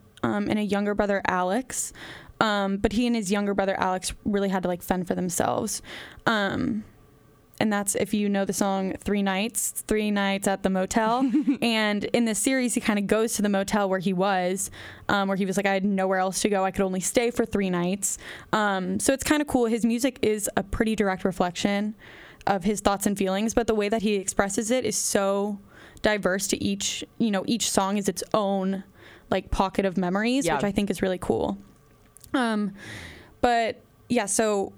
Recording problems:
squashed, flat; heavily

